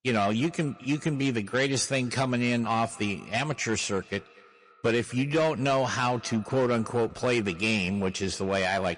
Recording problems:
echo of what is said; faint; throughout; 240 ms later, 25 dB below the speech
distortion; slight; 7% of the sound clipped
garbled, watery; slightly

